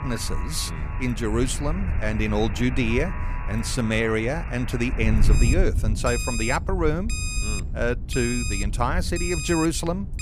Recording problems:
alarms or sirens; loud; throughout; 9 dB below the speech
wind noise on the microphone; occasional gusts; 15 dB below the speech

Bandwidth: 15 kHz